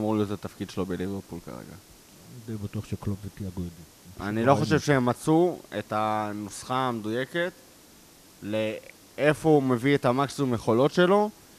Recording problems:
hiss; faint; throughout; 25 dB below the speech
abrupt cut into speech; at the start

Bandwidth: 14.5 kHz